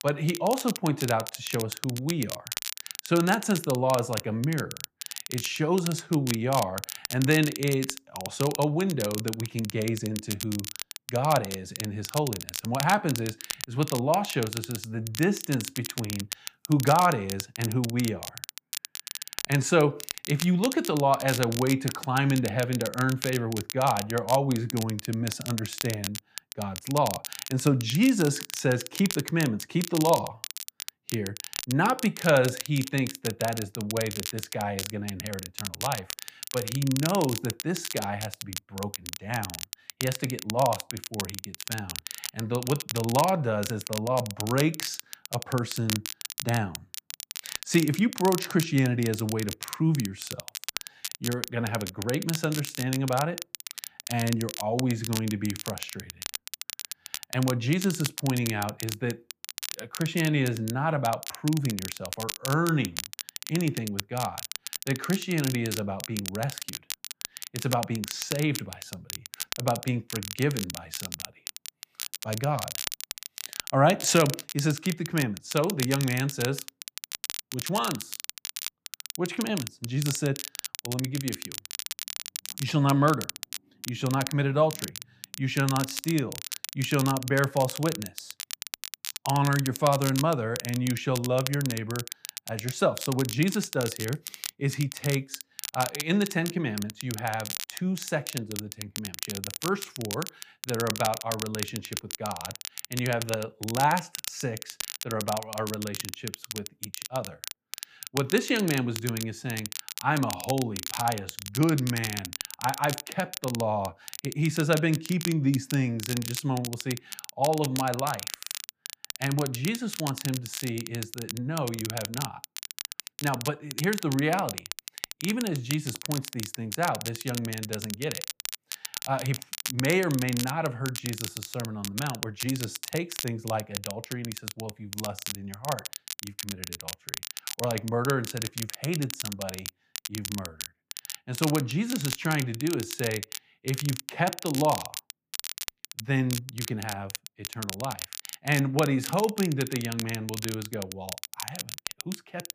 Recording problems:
crackle, like an old record; loud; 7 dB below the speech

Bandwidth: 15 kHz